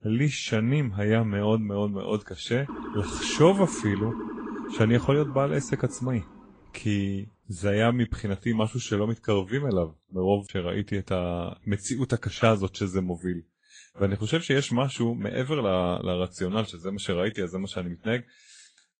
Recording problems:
garbled, watery; slightly; nothing above 8.5 kHz
siren; noticeable; from 2.5 to 6.5 s; peak 8 dB below the speech

